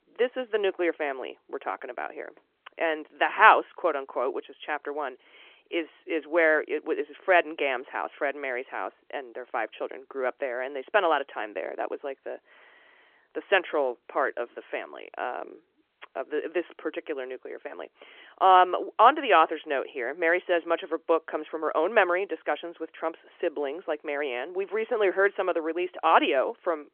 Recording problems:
phone-call audio

